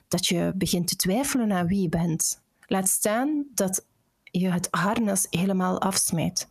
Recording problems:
squashed, flat; heavily

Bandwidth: 14.5 kHz